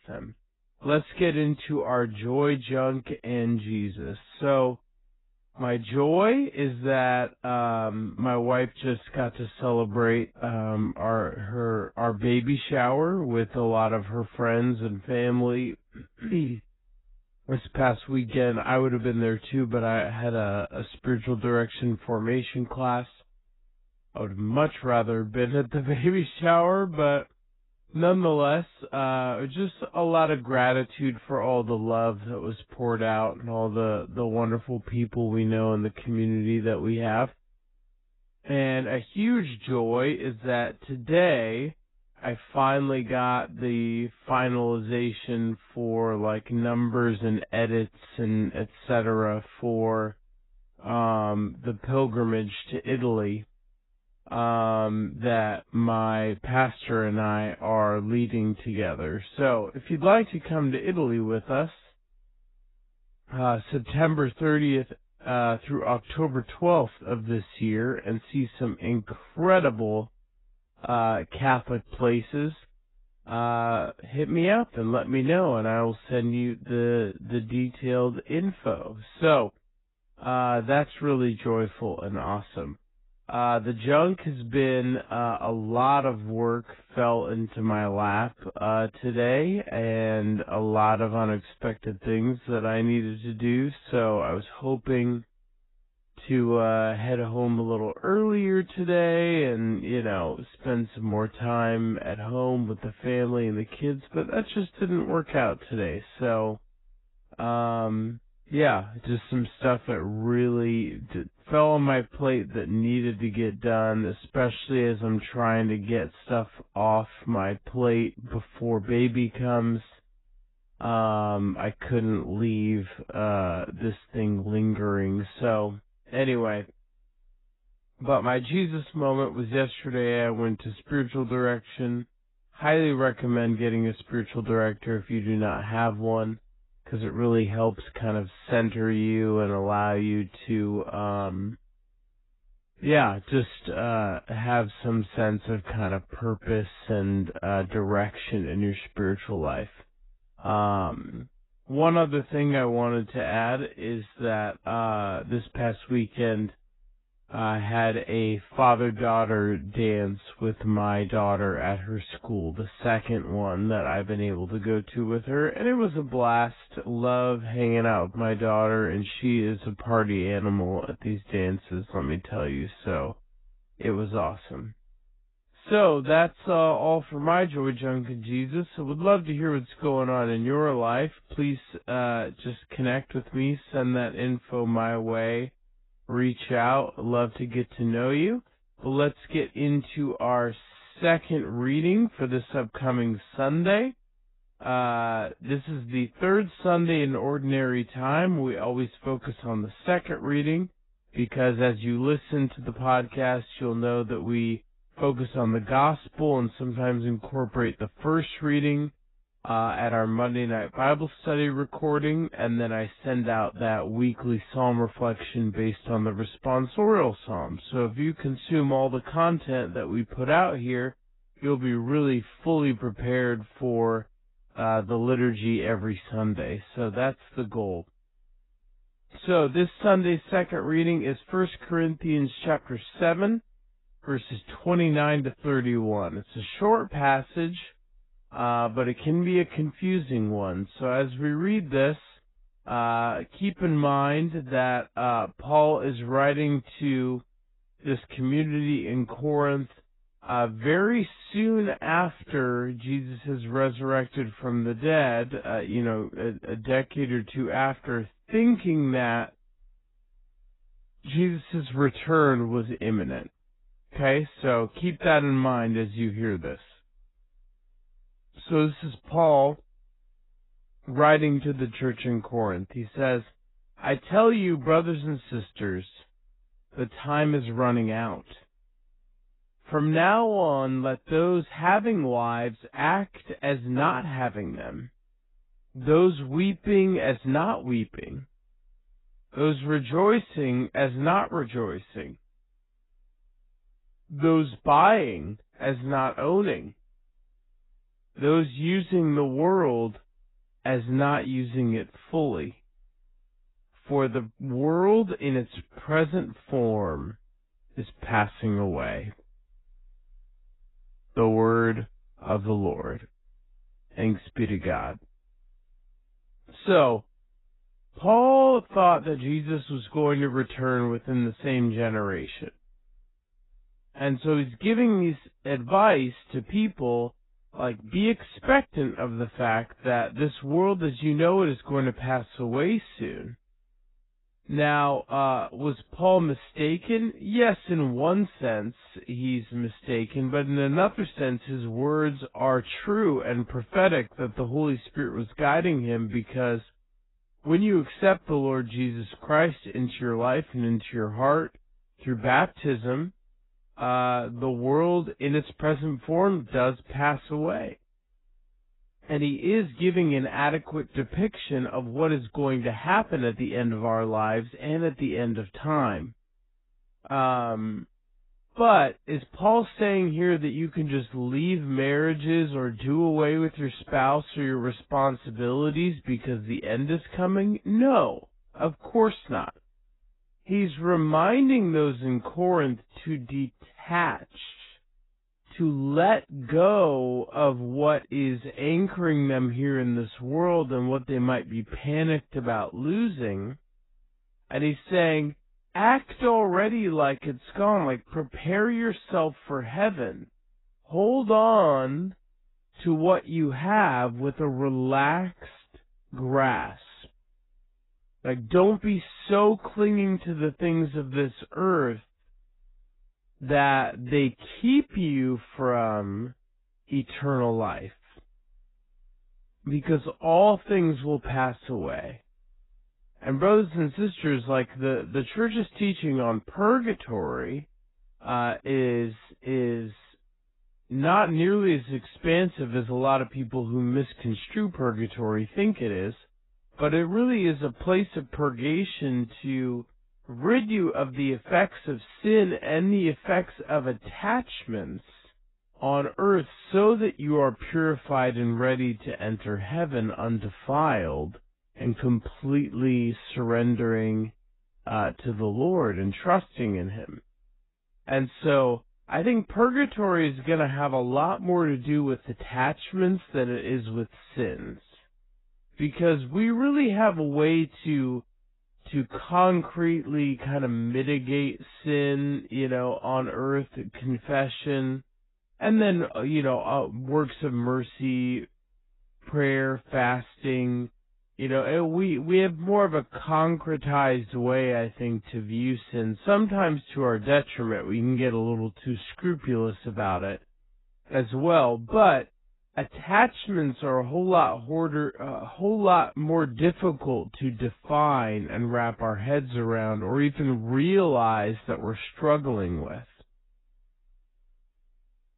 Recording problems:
garbled, watery; badly; nothing above 4 kHz
wrong speed, natural pitch; too slow; 0.6 times normal speed

